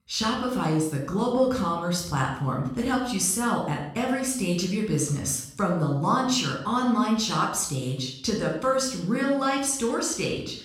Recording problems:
room echo; noticeable; dies away in 0.6 s
off-mic speech; somewhat distant

